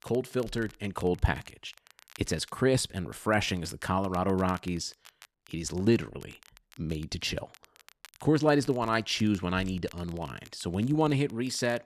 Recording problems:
crackle, like an old record; faint; 25 dB below the speech

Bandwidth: 13.5 kHz